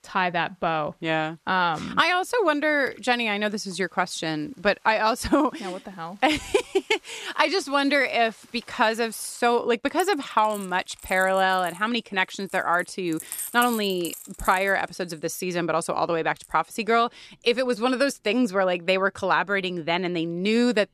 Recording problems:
household noises; noticeable; throughout; 15 dB below the speech

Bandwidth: 14 kHz